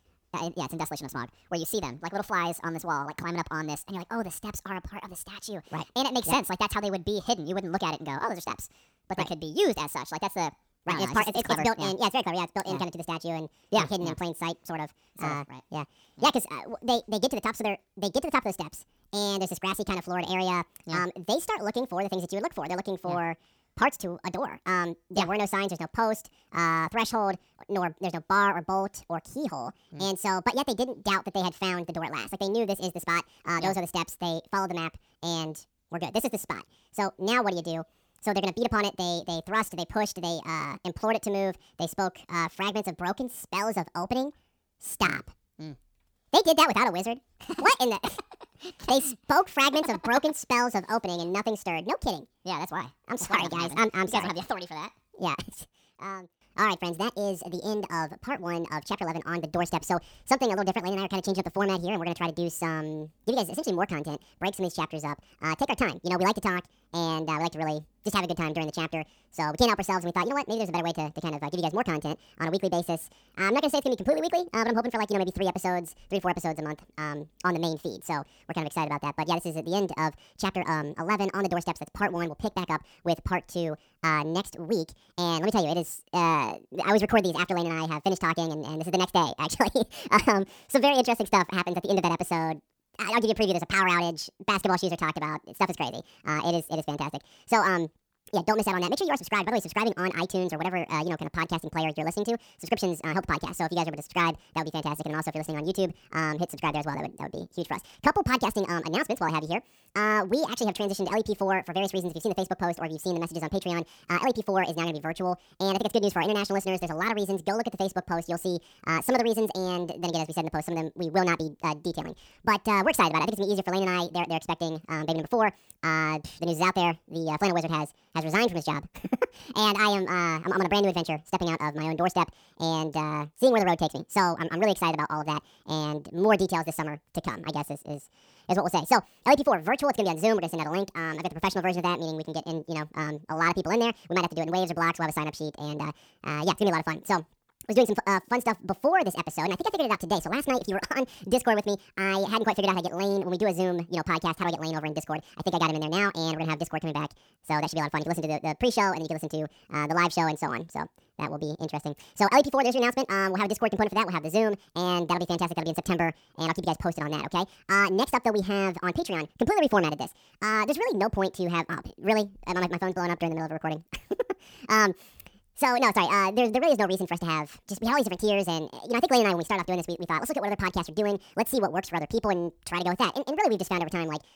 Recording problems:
wrong speed and pitch; too fast and too high; 1.7 times normal speed

